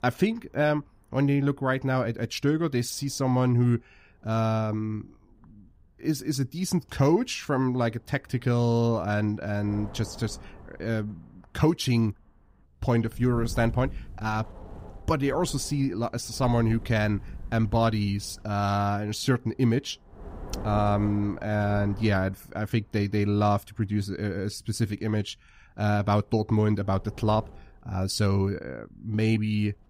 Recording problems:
wind noise on the microphone; occasional gusts; 20 dB below the speech

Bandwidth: 15.5 kHz